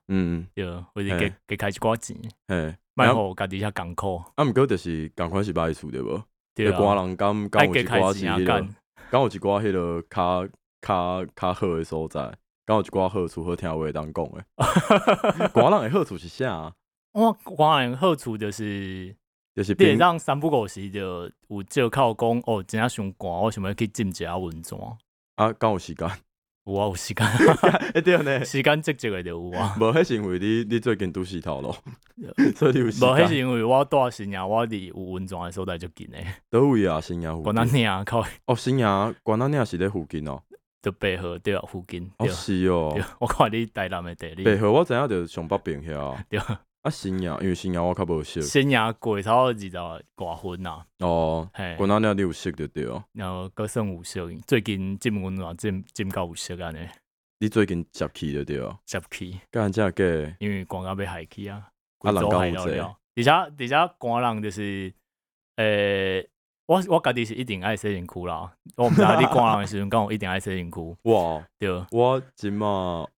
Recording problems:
none

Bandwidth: 17.5 kHz